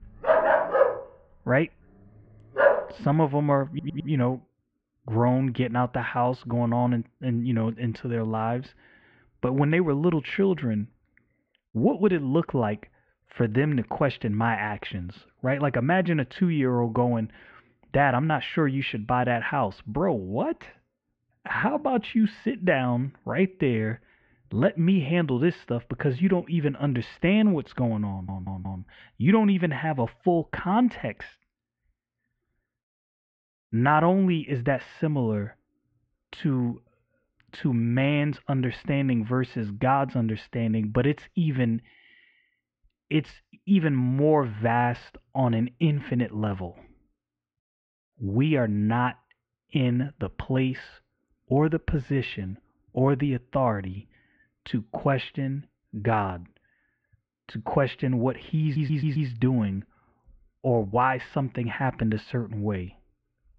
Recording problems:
muffled; very; fading above 2.5 kHz
dog barking; loud; until 3 s; peak 5 dB above the speech
audio stuttering; at 3.5 s, at 28 s and at 59 s

